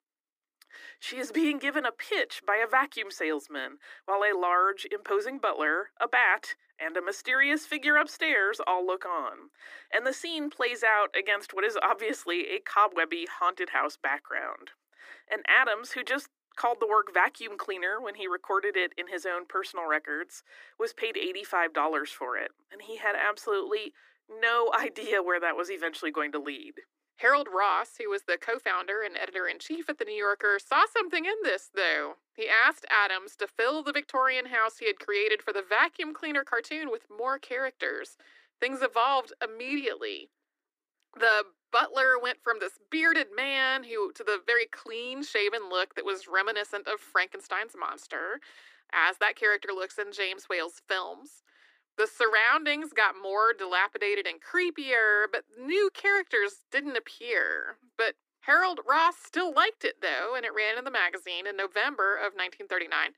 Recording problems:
thin; very; fading below 300 Hz

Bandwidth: 15 kHz